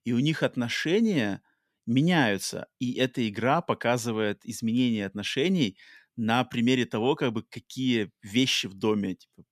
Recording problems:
none

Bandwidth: 14.5 kHz